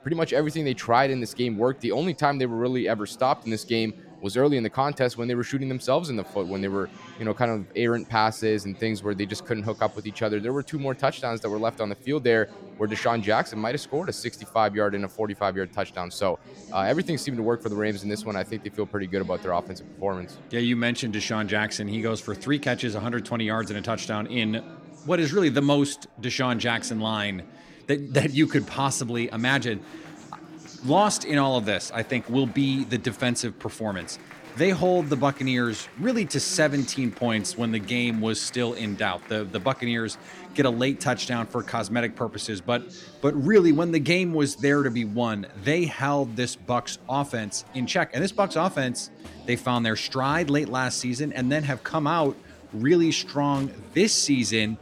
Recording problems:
murmuring crowd; noticeable; throughout; 20 dB below the speech

